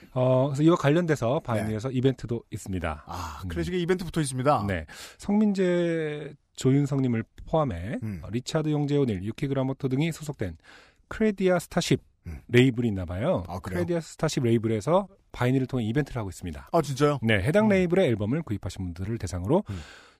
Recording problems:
none

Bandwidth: 15 kHz